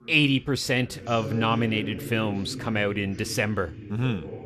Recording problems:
voice in the background; noticeable; throughout; 10 dB below the speech

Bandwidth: 14 kHz